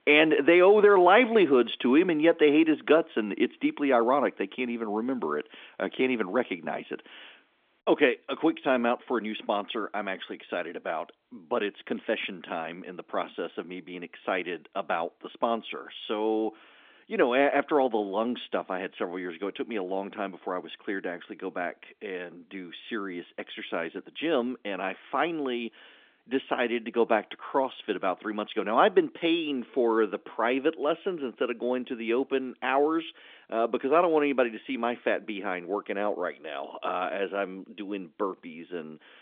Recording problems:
phone-call audio; nothing above 3.5 kHz

